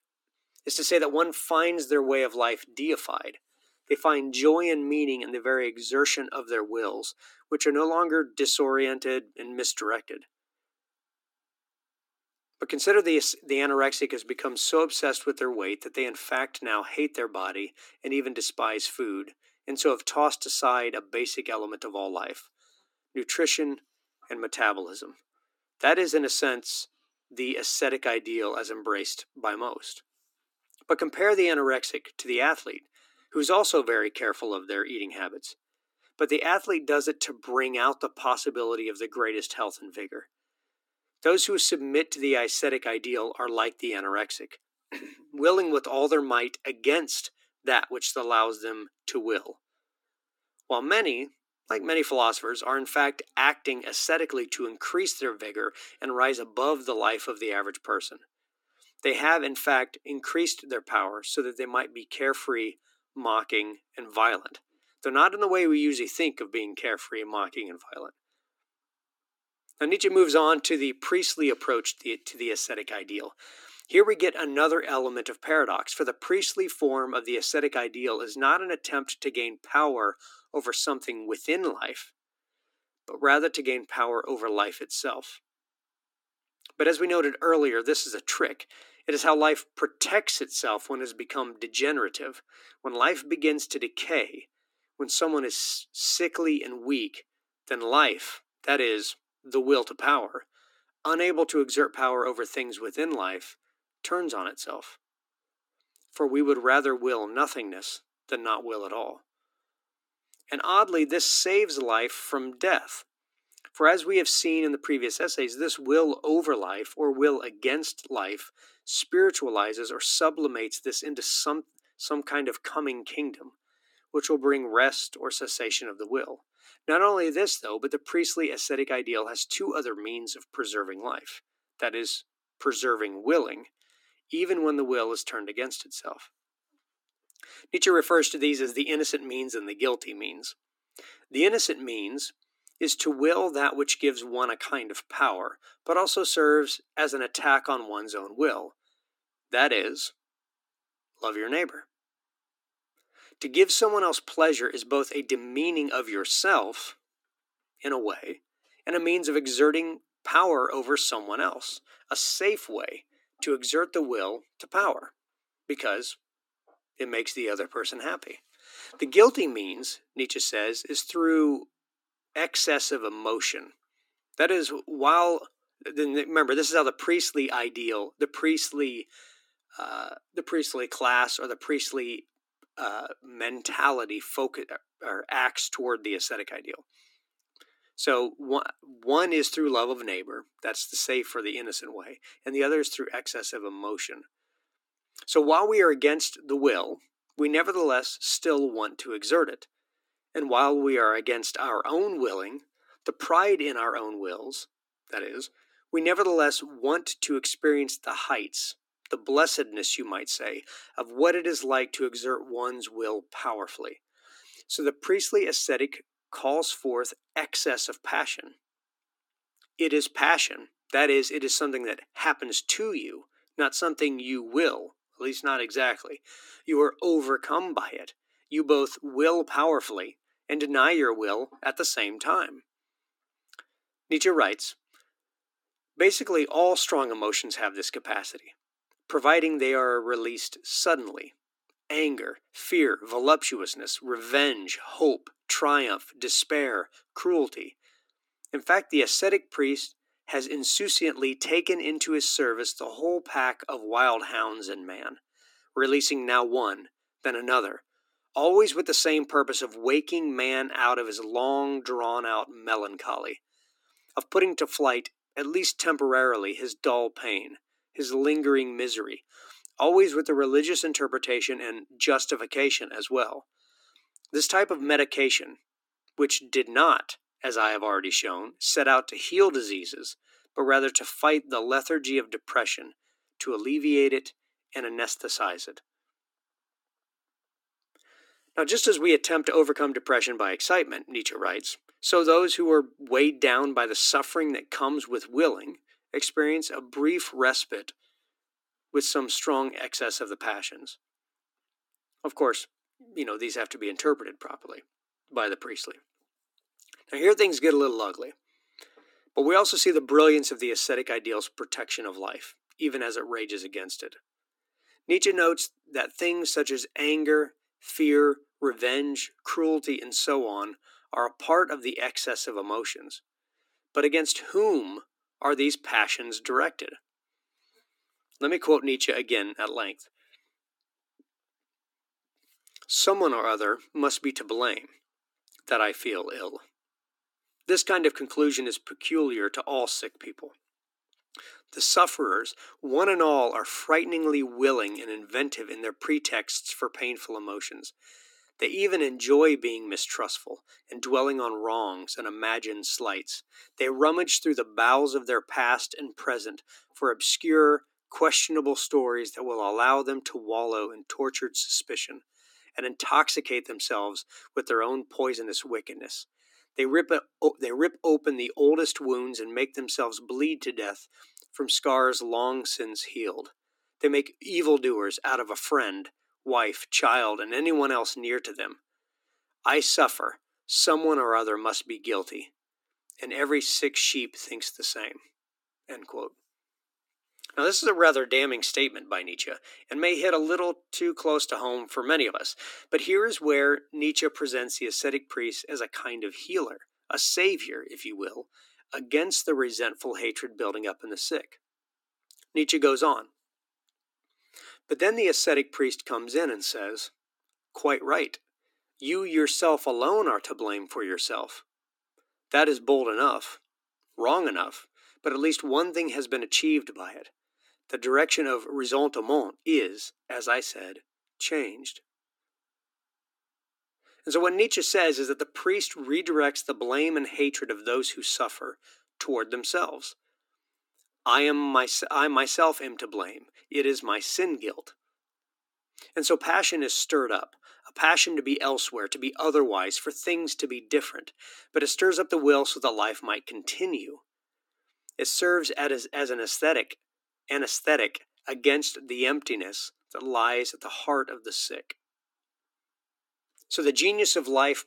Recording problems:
thin; somewhat; fading below 300 Hz

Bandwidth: 17 kHz